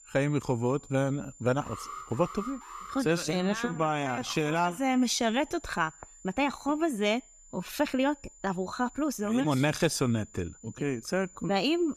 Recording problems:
high-pitched whine; faint; throughout; 7 kHz, 25 dB below the speech
uneven, jittery; strongly; from 1 to 11 s
alarm; faint; from 1.5 to 3 s; peak 10 dB below the speech

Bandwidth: 14.5 kHz